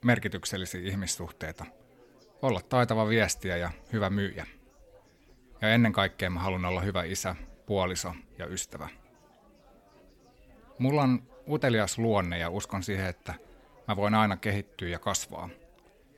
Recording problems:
chatter from many people; faint; throughout; 30 dB below the speech

